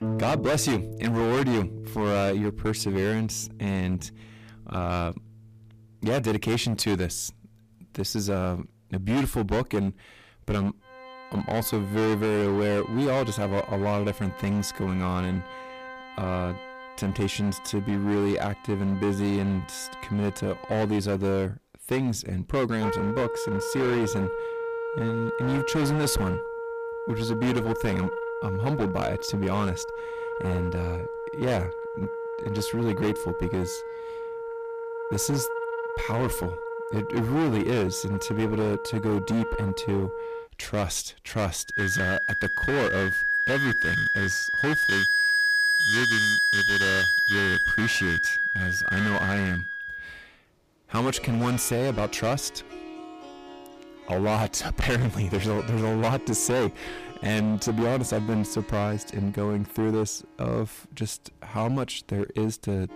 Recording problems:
distortion; heavy; 15% of the sound clipped
background music; very loud; throughout; as loud as the speech

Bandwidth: 15 kHz